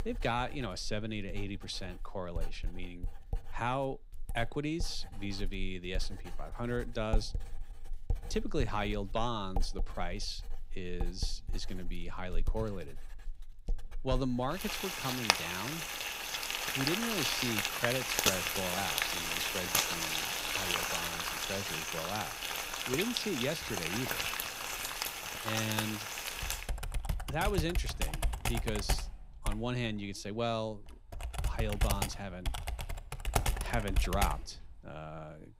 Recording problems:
household noises; very loud; throughout; 3 dB above the speech

